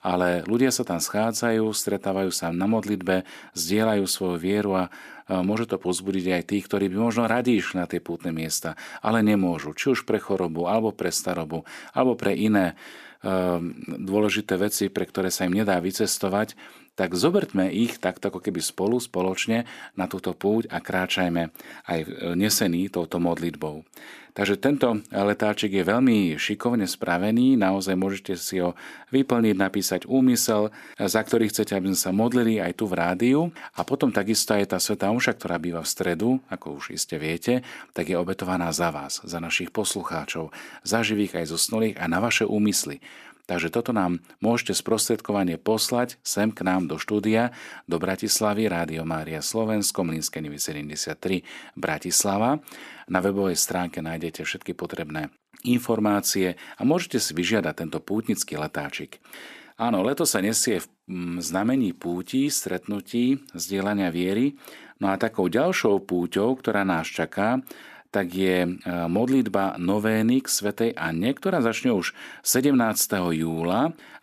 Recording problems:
none

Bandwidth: 14.5 kHz